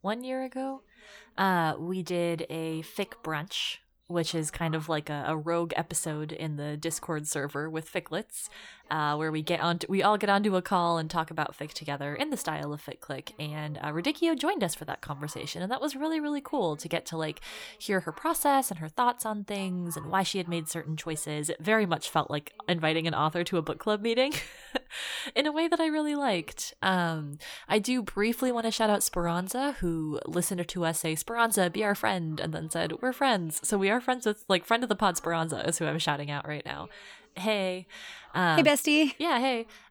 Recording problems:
voice in the background; faint; throughout; 25 dB below the speech

